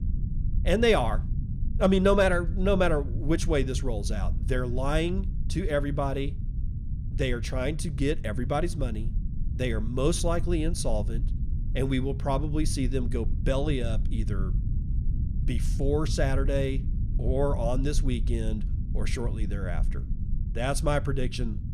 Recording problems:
low rumble; noticeable; throughout; 15 dB below the speech

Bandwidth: 14.5 kHz